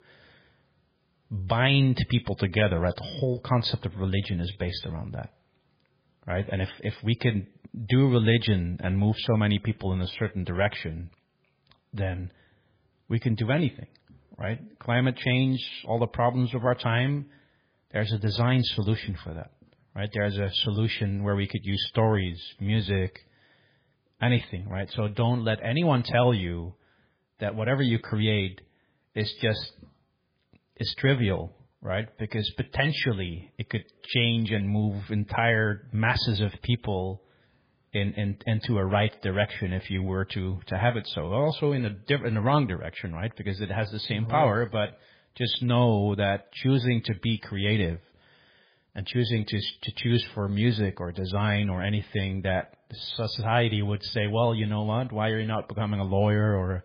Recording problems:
garbled, watery; badly; nothing above 5 kHz

